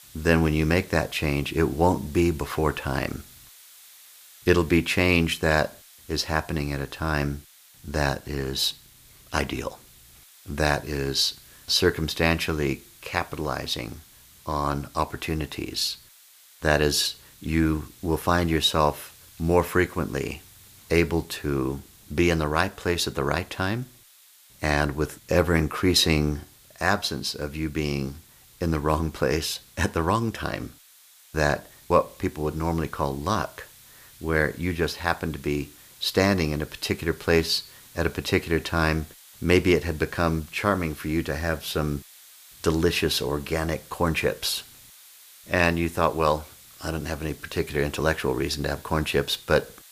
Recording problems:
hiss; faint; throughout; 25 dB below the speech

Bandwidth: 15 kHz